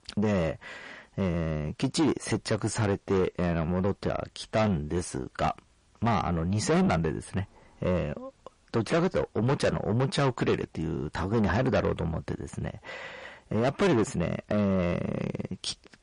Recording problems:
distortion; heavy; 6 dB below the speech
garbled, watery; slightly; nothing above 10.5 kHz

